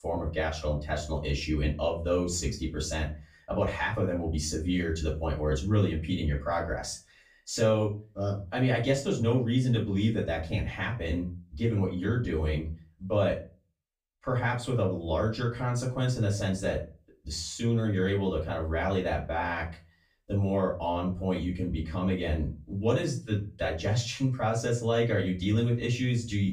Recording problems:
off-mic speech; far
room echo; slight; dies away in 0.3 s

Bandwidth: 15.5 kHz